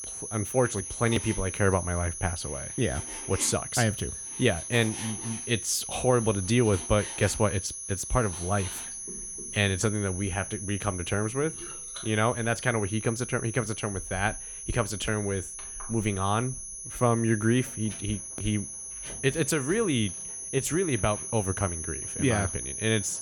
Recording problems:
high-pitched whine; loud; throughout; 10.5 kHz, 7 dB below the speech
household noises; noticeable; throughout; 20 dB below the speech

